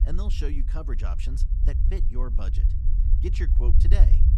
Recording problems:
low rumble; loud; throughout; 5 dB below the speech

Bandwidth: 14 kHz